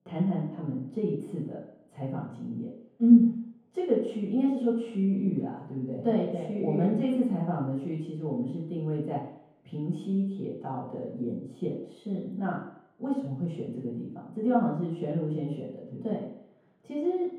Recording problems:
room echo; strong; dies away in 3 s
off-mic speech; far

